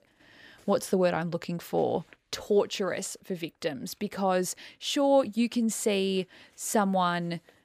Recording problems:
none

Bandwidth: 14.5 kHz